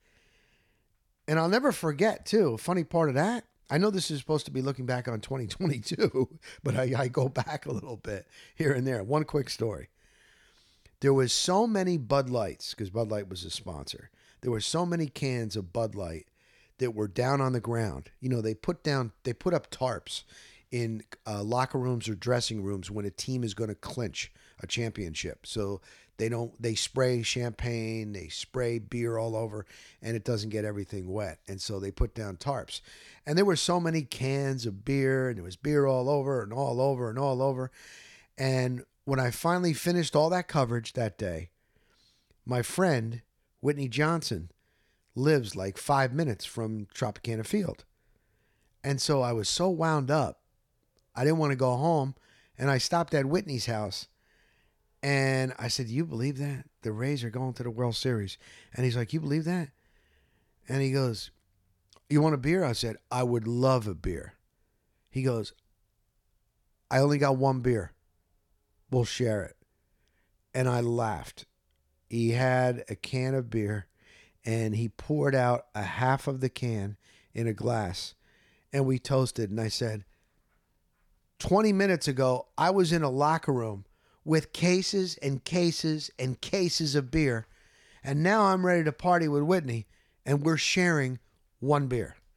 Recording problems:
none

